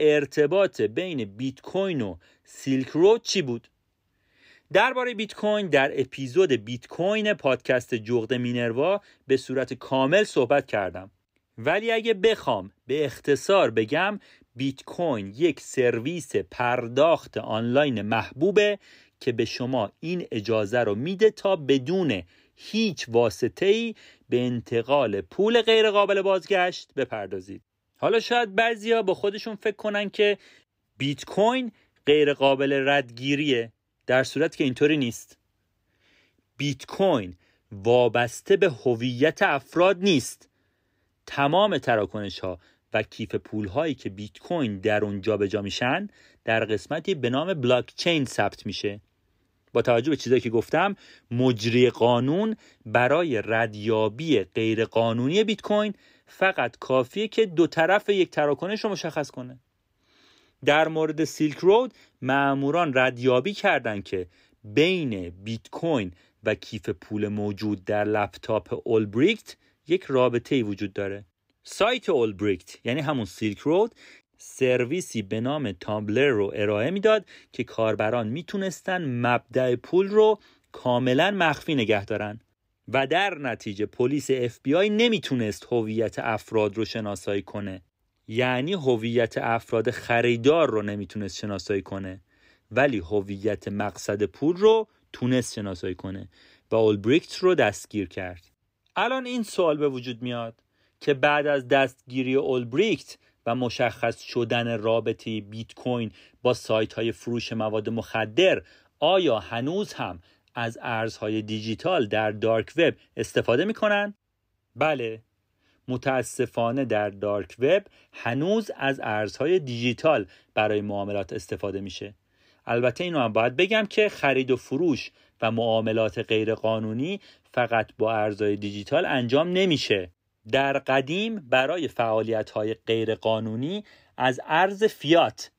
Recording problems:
abrupt cut into speech; at the start

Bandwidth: 15.5 kHz